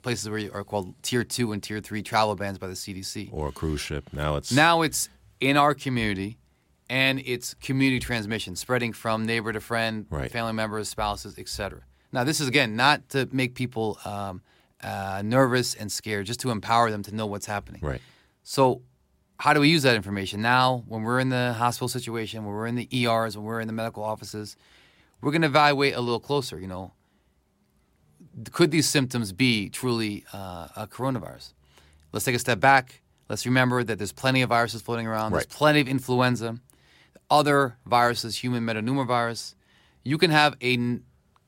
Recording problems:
none

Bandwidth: 16 kHz